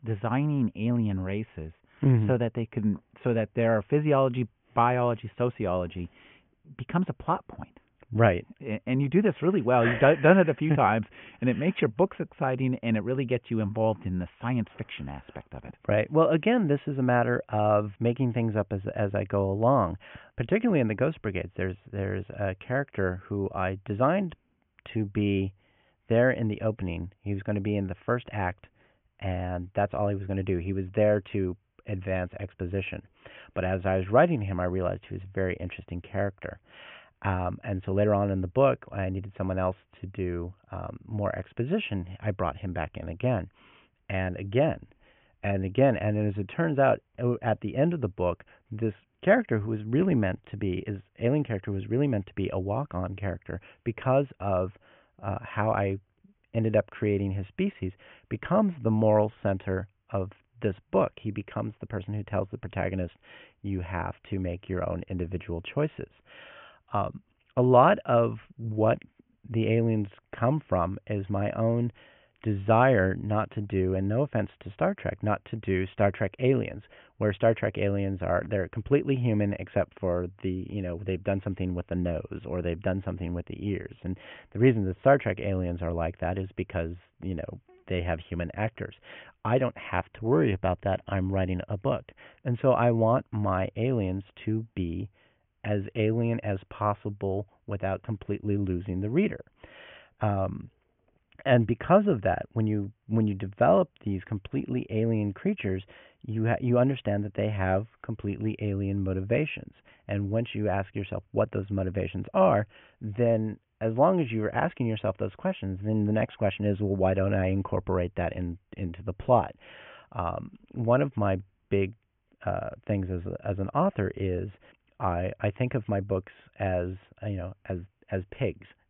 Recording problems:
high frequencies cut off; severe; nothing above 3 kHz

